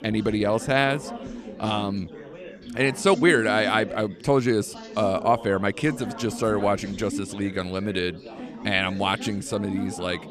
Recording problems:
chatter from many people; noticeable; throughout; 10 dB below the speech

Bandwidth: 14.5 kHz